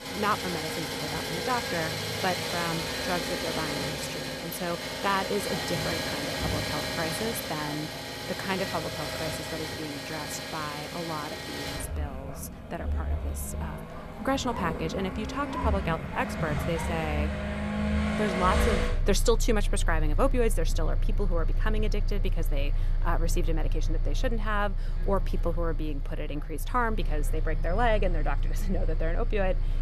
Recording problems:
traffic noise; very loud; throughout; 1 dB above the speech

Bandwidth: 14 kHz